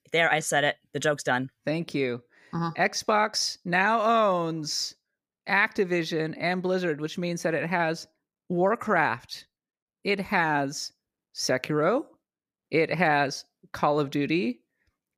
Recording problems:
none

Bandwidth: 15 kHz